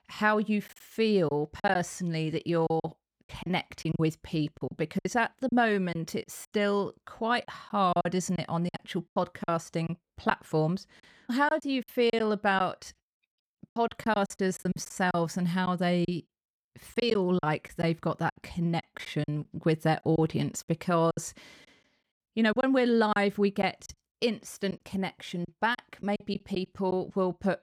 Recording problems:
choppy; very; 9% of the speech affected

